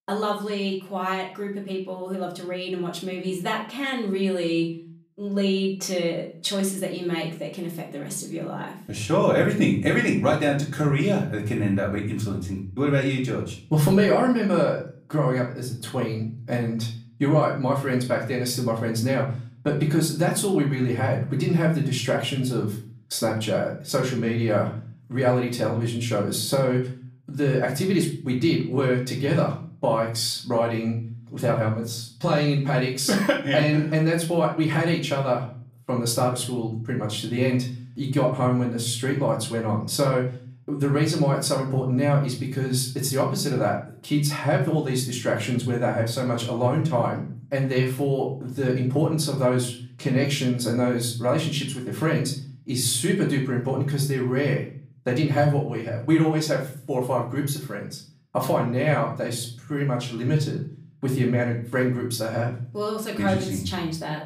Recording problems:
off-mic speech; far
room echo; slight; dies away in 0.4 s

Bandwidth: 15 kHz